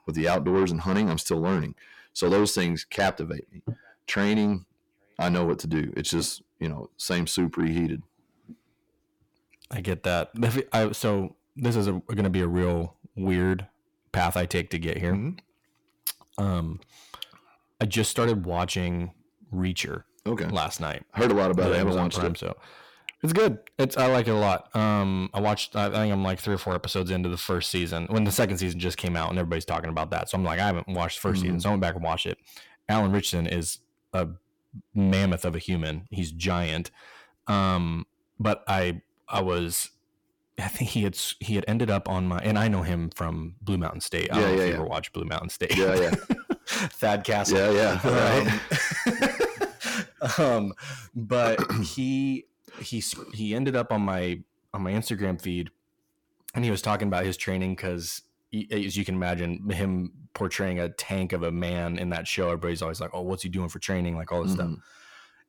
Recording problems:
distortion; heavy; 8 dB below the speech

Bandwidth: 18 kHz